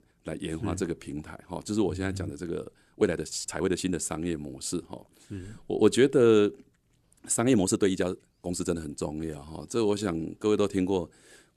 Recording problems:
uneven, jittery; strongly; from 3 to 10 s

